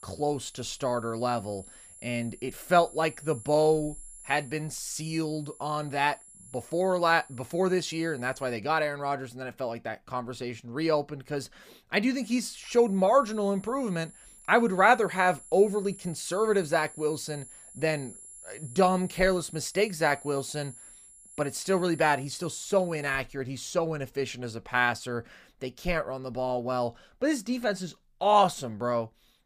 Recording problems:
high-pitched whine; noticeable; until 8.5 s and from 12 to 23 s; 10.5 kHz, 20 dB below the speech

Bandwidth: 15 kHz